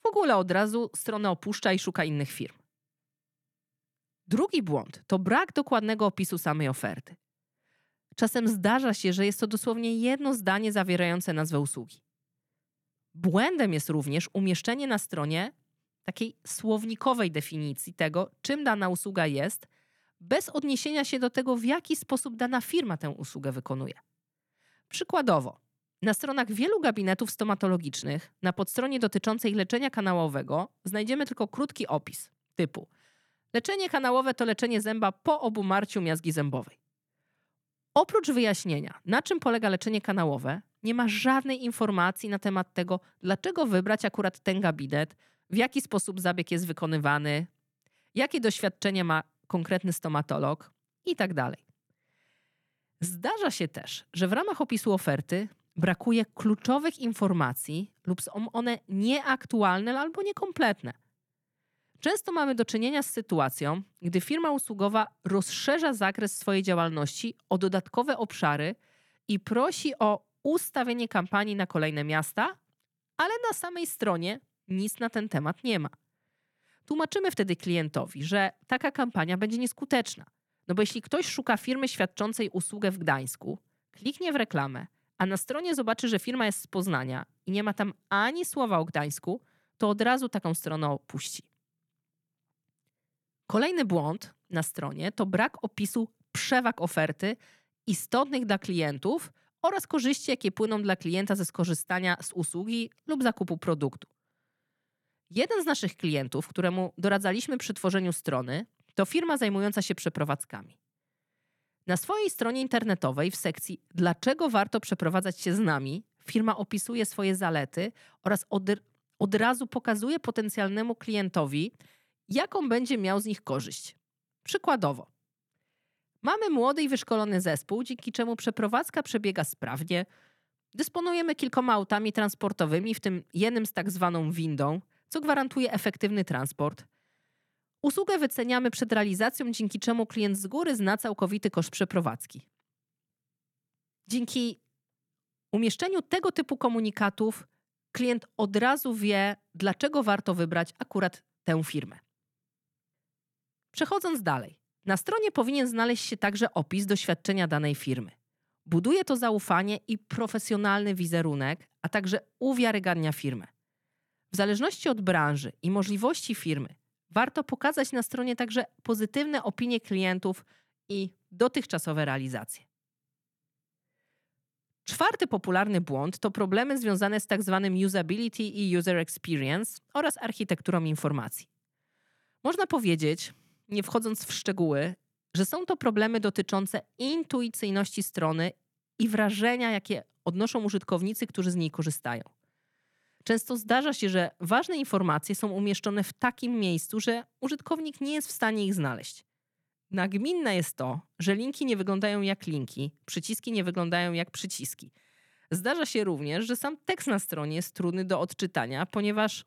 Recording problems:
none

